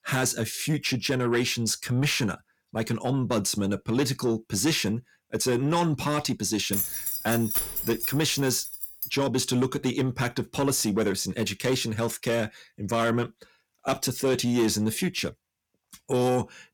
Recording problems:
distortion; slight; 10 dB below the speech
jangling keys; loud; from 6.5 to 9 s; peak 1 dB above the speech

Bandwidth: 19 kHz